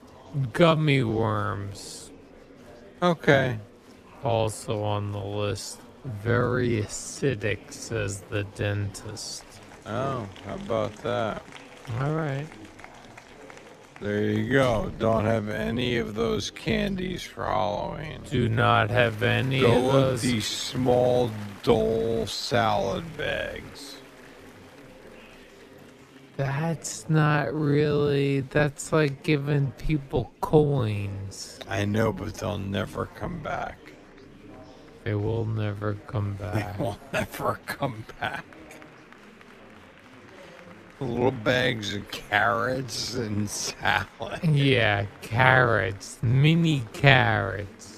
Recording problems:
wrong speed, natural pitch; too slow; 0.5 times normal speed
murmuring crowd; faint; throughout; 20 dB below the speech

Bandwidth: 14.5 kHz